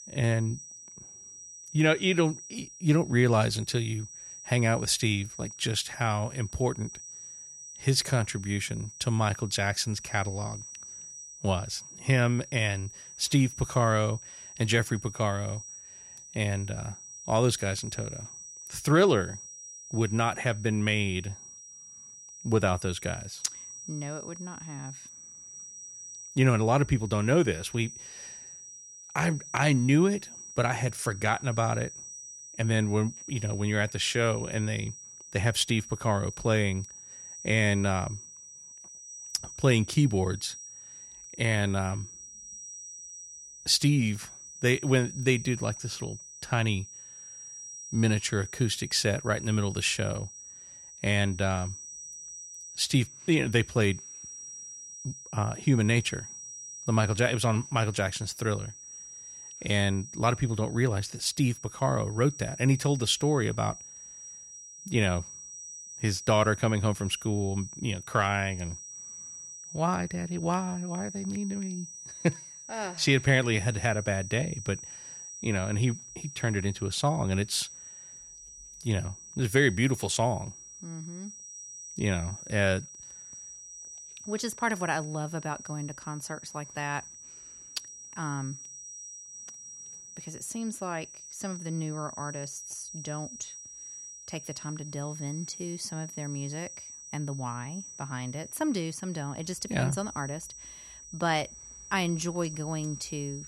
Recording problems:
high-pitched whine; noticeable; throughout; 6 kHz, 15 dB below the speech

